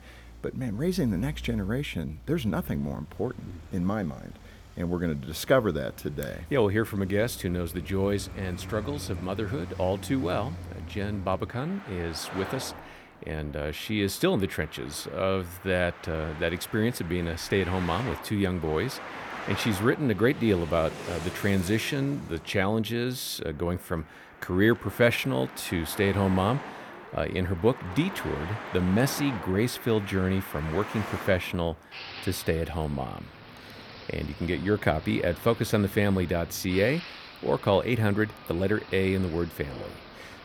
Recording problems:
traffic noise; noticeable; throughout; 15 dB below the speech

